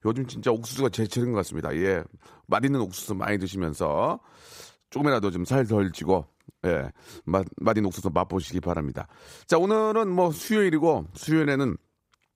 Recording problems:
uneven, jittery; strongly; from 1 to 12 s

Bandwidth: 15.5 kHz